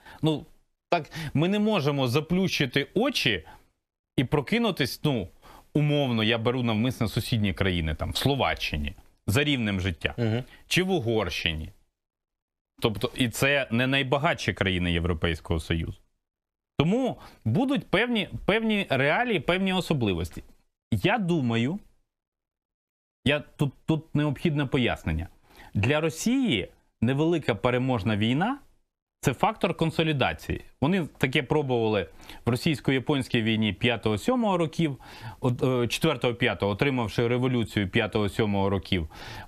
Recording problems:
squashed, flat; somewhat

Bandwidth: 14.5 kHz